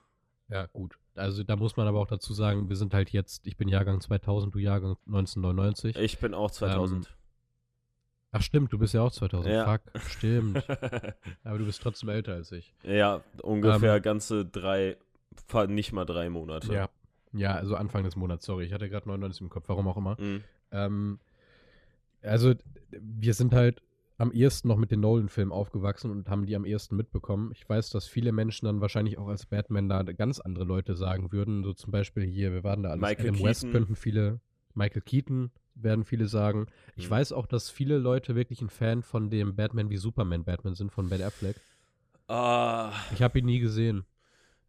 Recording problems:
none

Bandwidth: 14.5 kHz